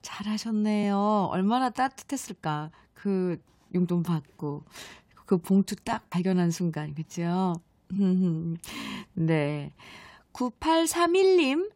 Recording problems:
uneven, jittery; strongly; from 0.5 to 11 s

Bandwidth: 16 kHz